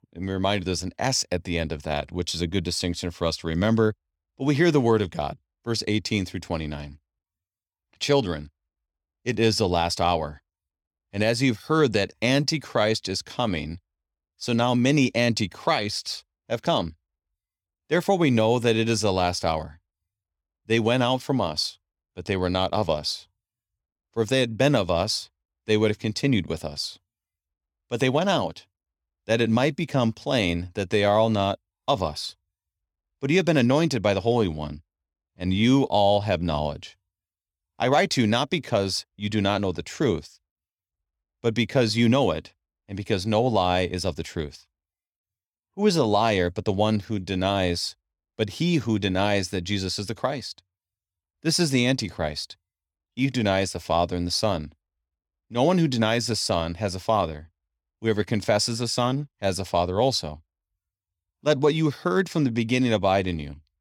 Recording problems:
none

